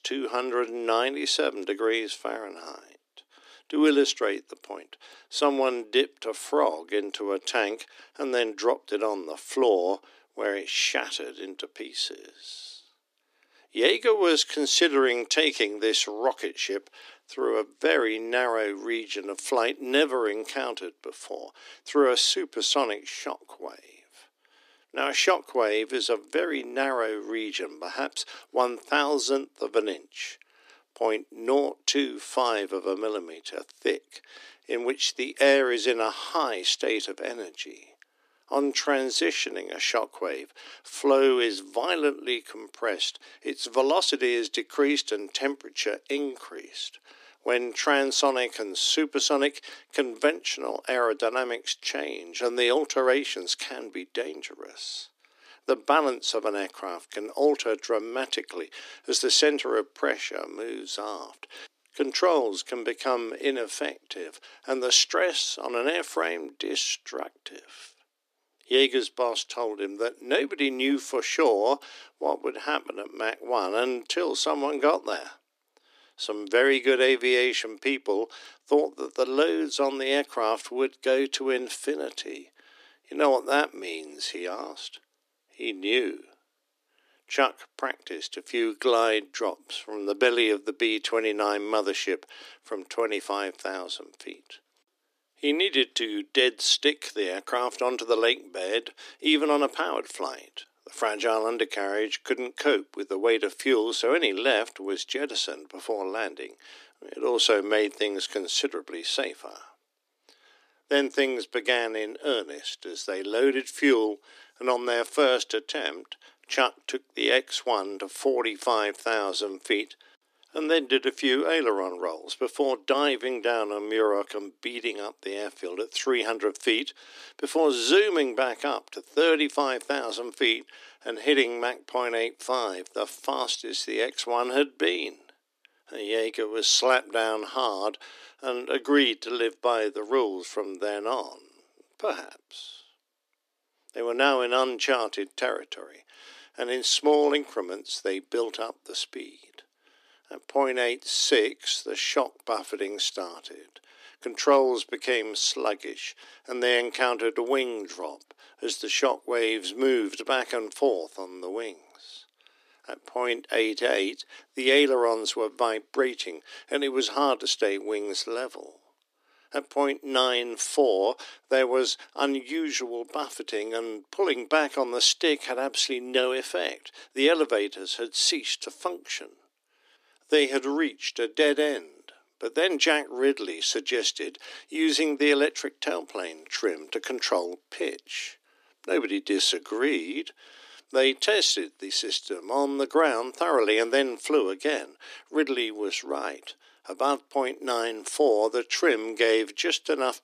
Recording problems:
thin; somewhat; fading below 300 Hz

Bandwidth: 14.5 kHz